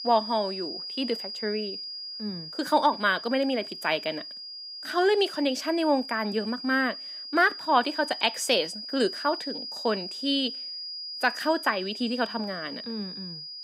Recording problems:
high-pitched whine; loud; throughout; 5 kHz, 8 dB below the speech

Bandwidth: 15.5 kHz